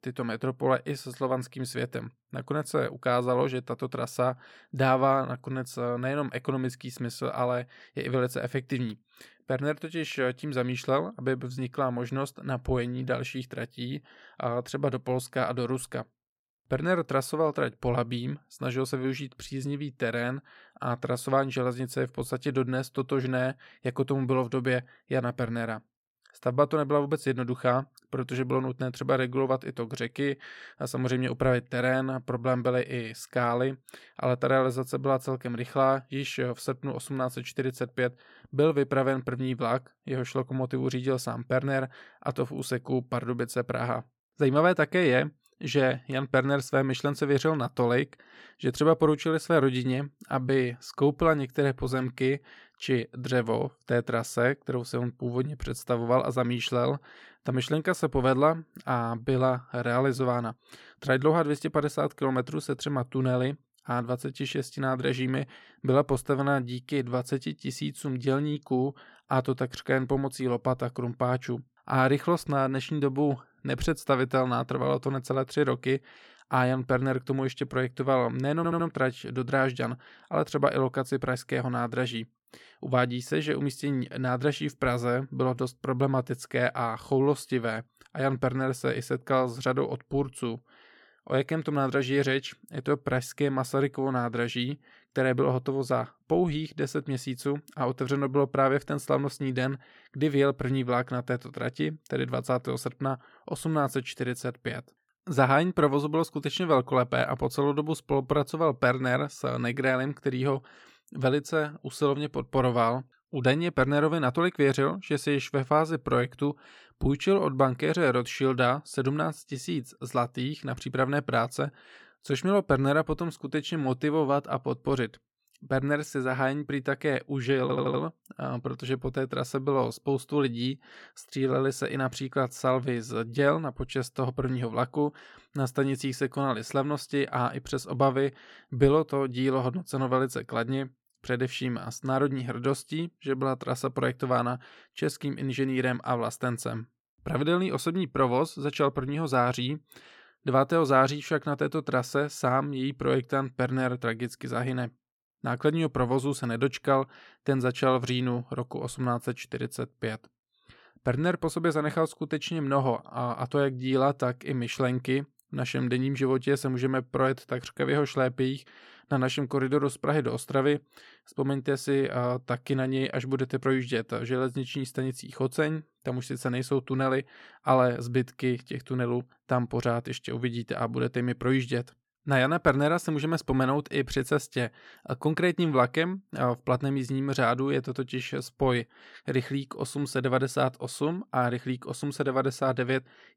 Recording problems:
audio stuttering; at 1:19 and at 2:08

